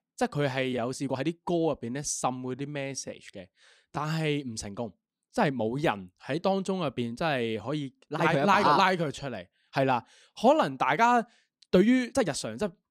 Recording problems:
uneven, jittery; strongly; from 0.5 to 12 s

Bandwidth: 15 kHz